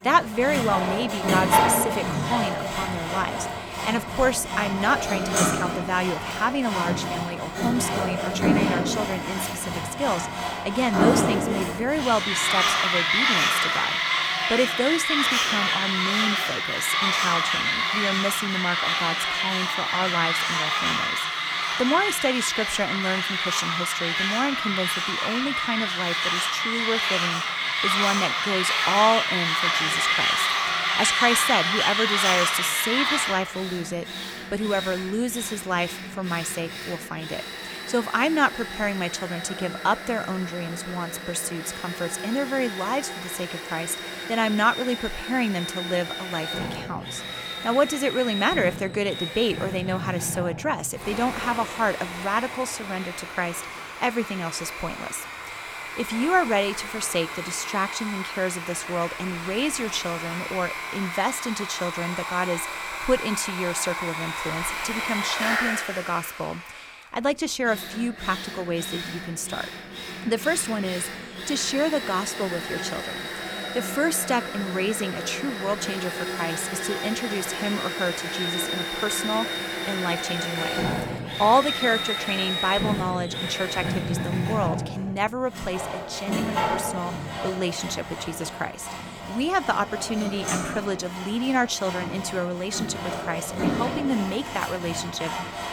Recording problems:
machinery noise; very loud; throughout; 1 dB above the speech

